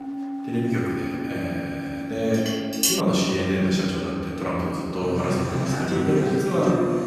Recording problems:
room echo; strong; dies away in 2.3 s
off-mic speech; far
background music; loud; throughout; 4 dB below the speech
murmuring crowd; faint; throughout; 25 dB below the speech
clattering dishes; loud; at 2.5 s; peak 4 dB above the speech

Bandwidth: 14 kHz